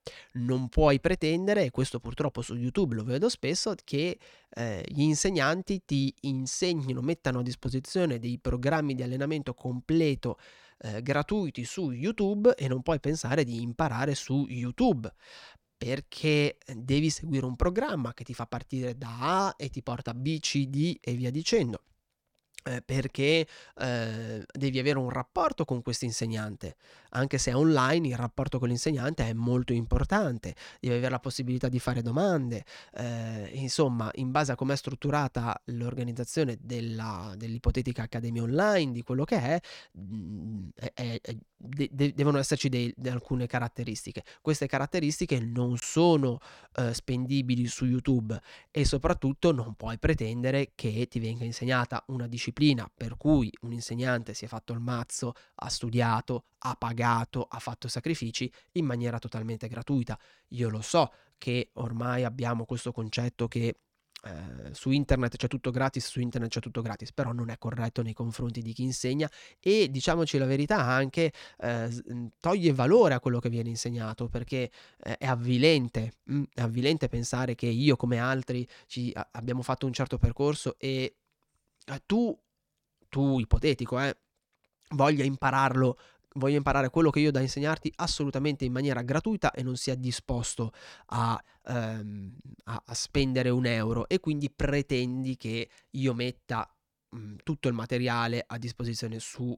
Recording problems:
none

